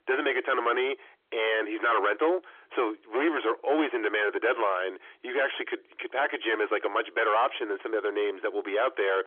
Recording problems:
distortion; heavy; 6 dB below the speech
phone-call audio; nothing above 3.5 kHz

